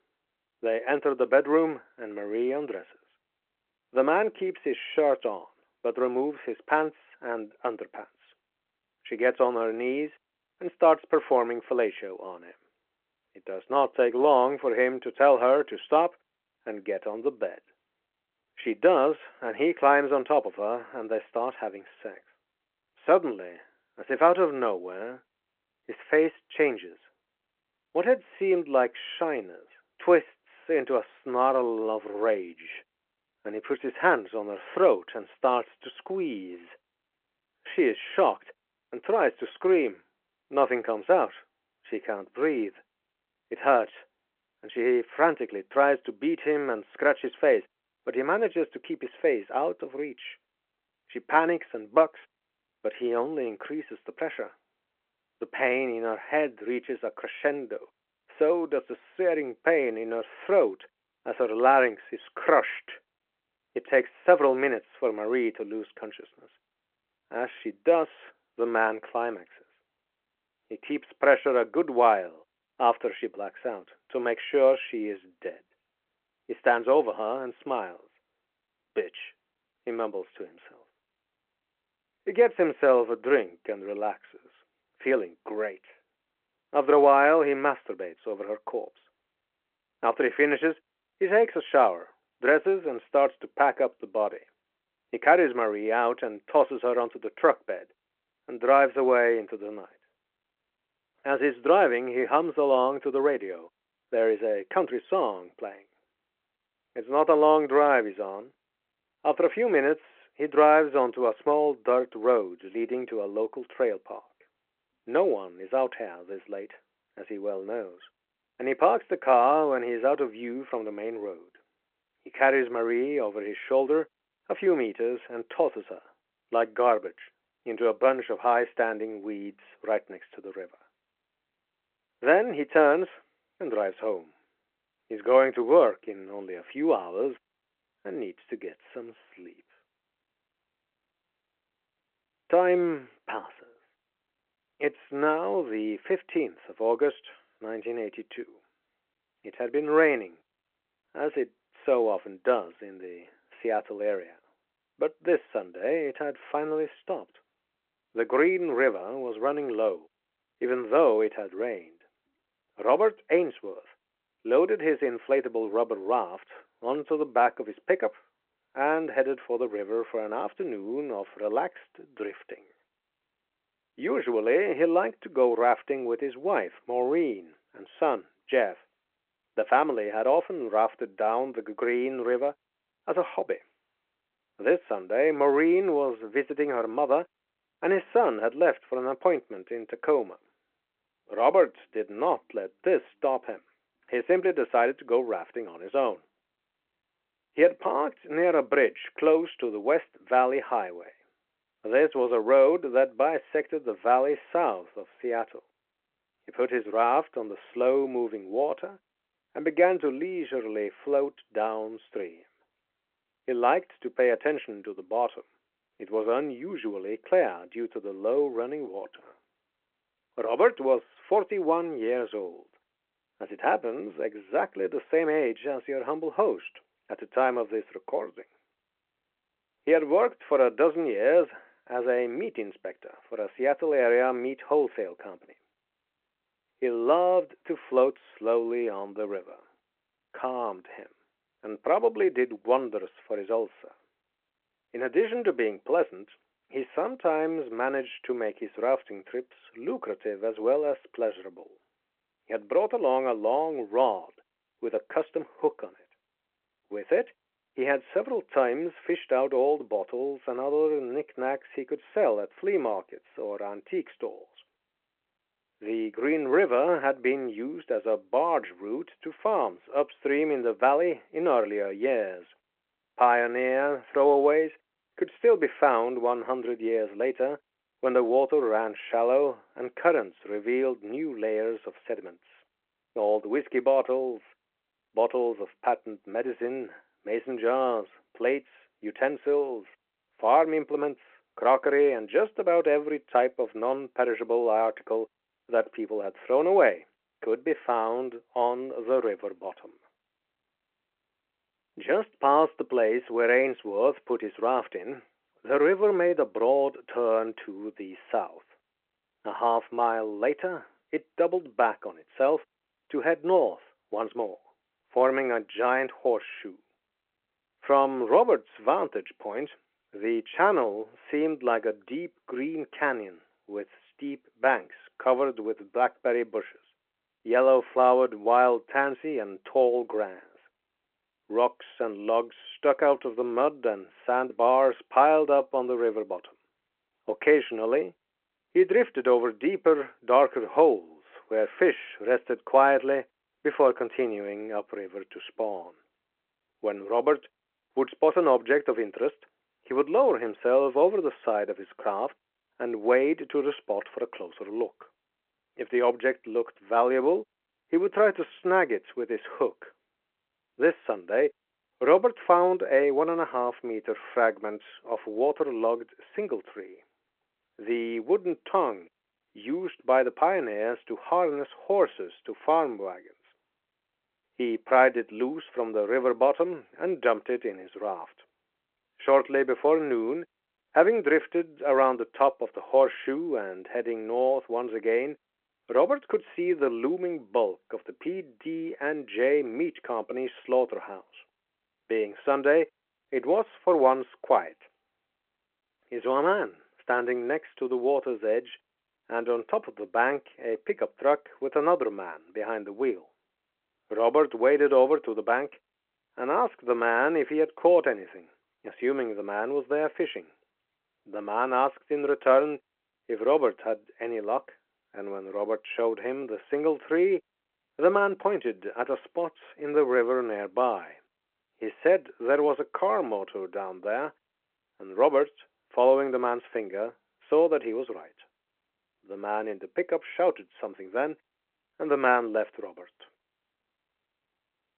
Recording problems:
phone-call audio

